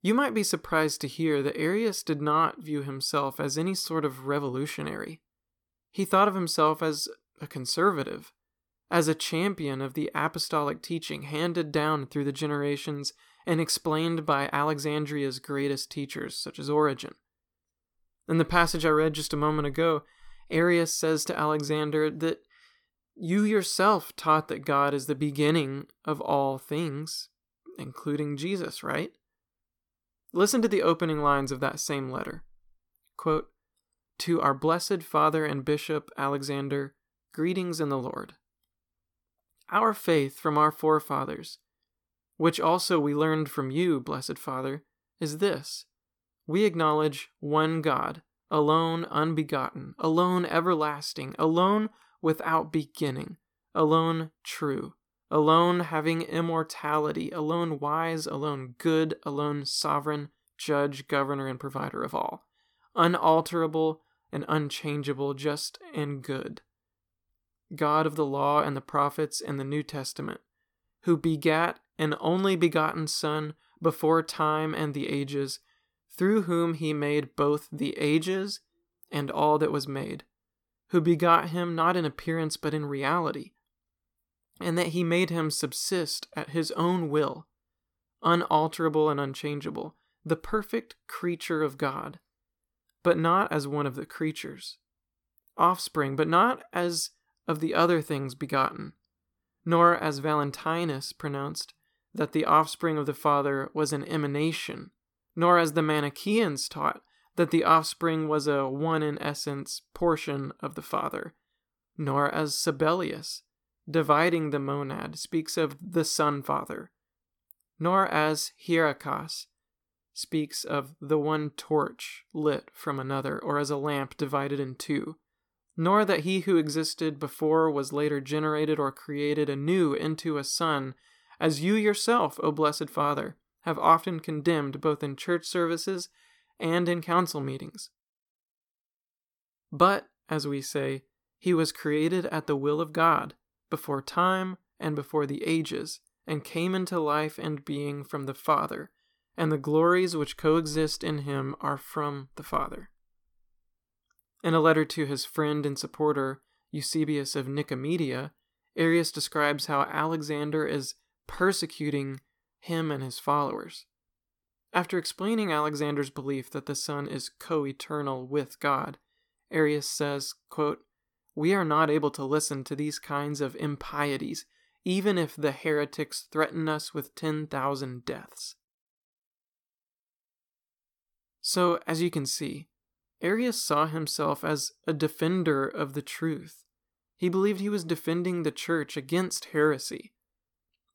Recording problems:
none

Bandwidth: 18 kHz